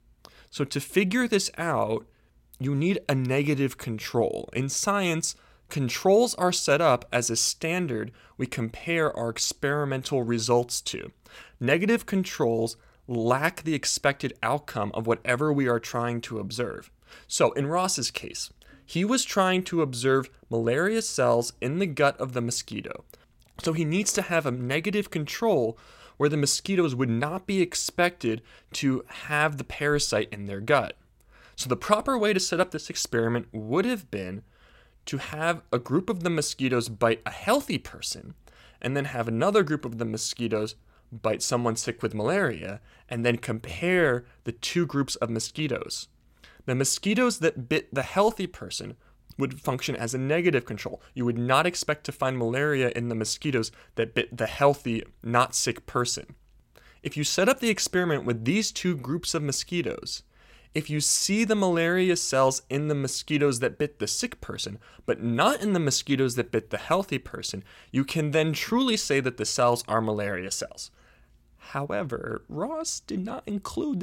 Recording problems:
abrupt cut into speech; at the end

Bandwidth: 16 kHz